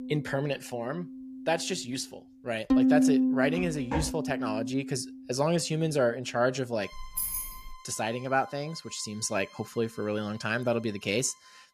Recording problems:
background music; very loud; throughout; 2 dB above the speech
footsteps; noticeable; at 3.5 s; peak 3 dB below the speech
jangling keys; loud; at 7 s; peak 1 dB above the speech

